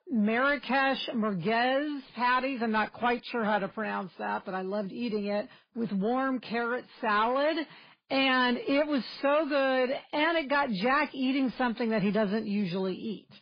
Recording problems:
garbled, watery; badly; nothing above 4 kHz
distortion; slight; 10 dB below the speech

